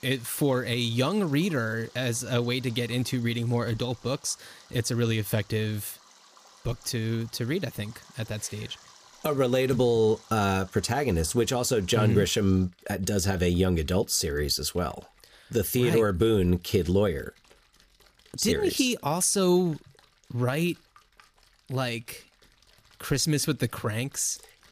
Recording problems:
rain or running water; faint; throughout; 25 dB below the speech

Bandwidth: 15 kHz